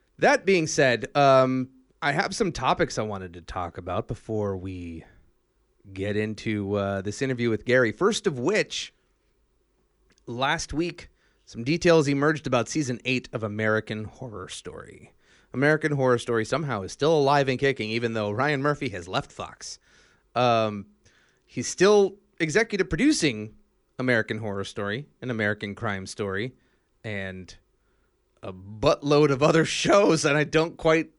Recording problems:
none

